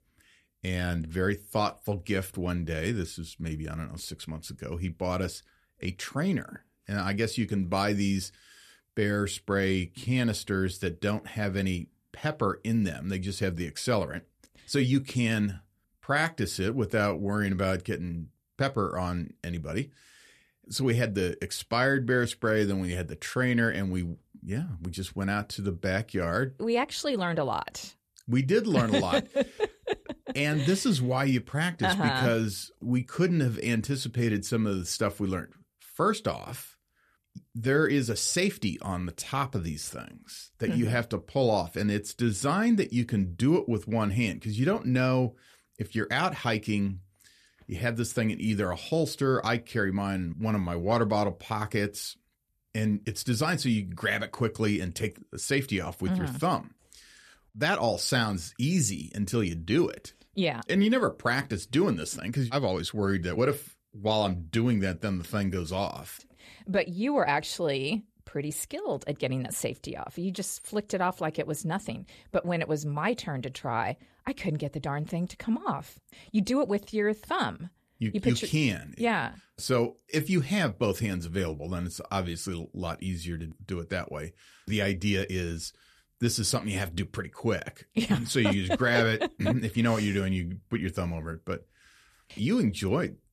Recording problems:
none

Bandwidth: 14 kHz